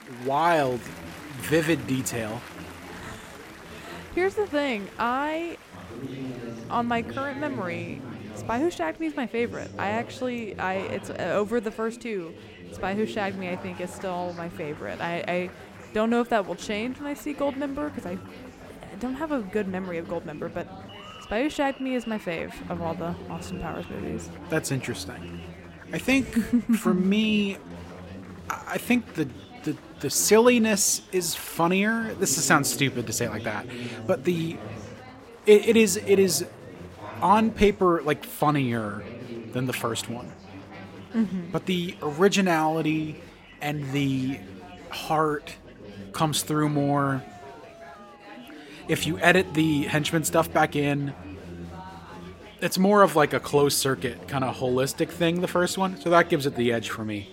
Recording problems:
chatter from many people; noticeable; throughout; 15 dB below the speech

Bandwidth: 16 kHz